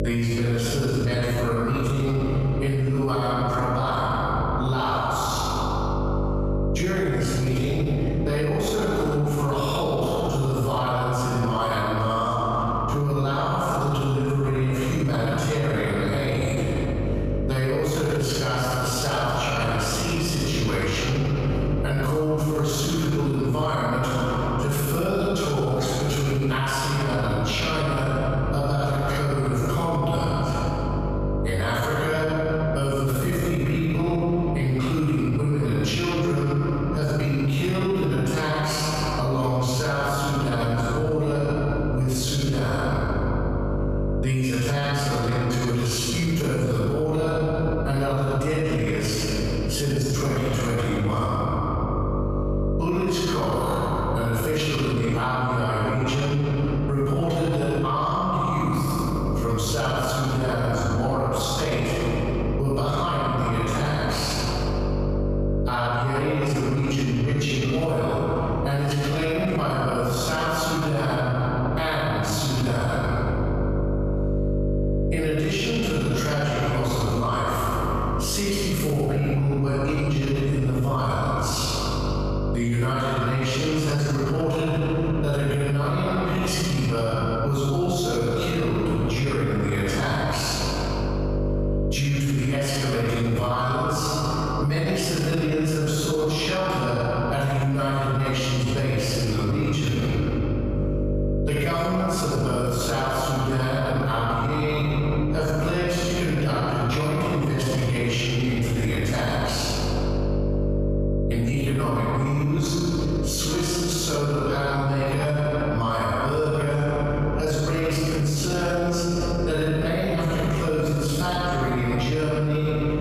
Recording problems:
room echo; strong; dies away in 2.2 s
off-mic speech; far
squashed, flat; somewhat
electrical hum; noticeable; throughout; 50 Hz, 10 dB below the speech

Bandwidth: 14.5 kHz